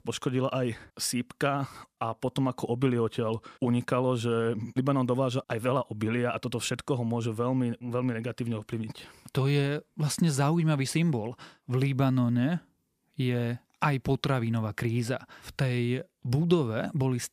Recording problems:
none

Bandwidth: 15 kHz